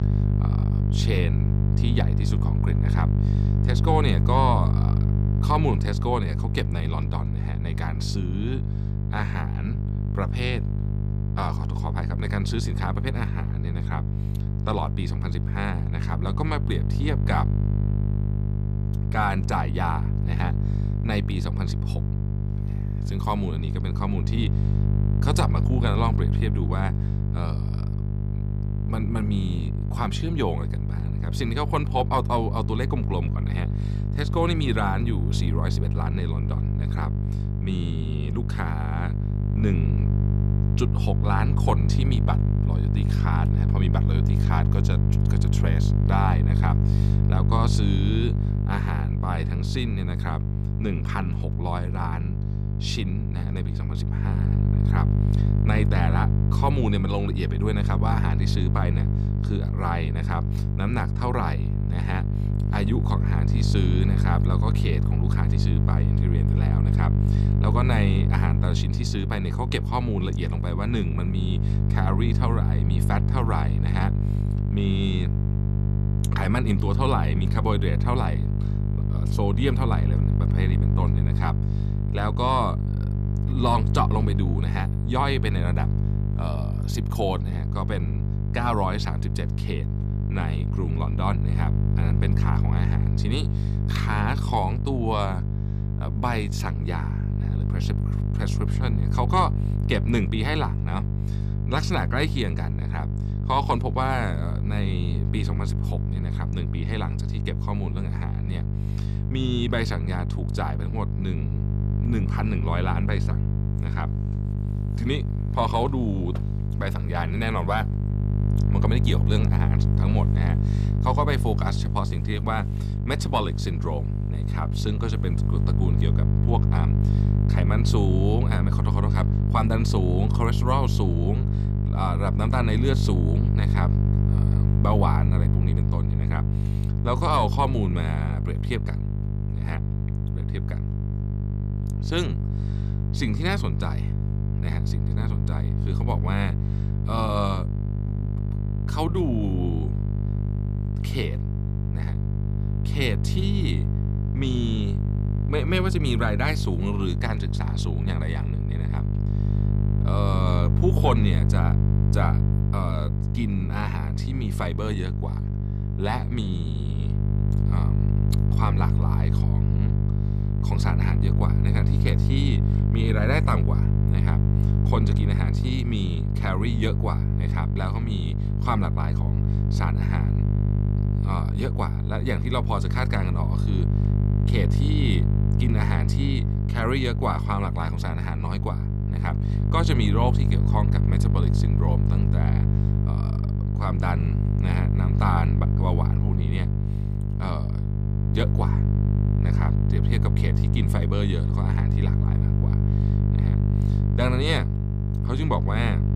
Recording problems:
electrical hum; loud; throughout; 50 Hz, 6 dB below the speech

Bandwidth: 15 kHz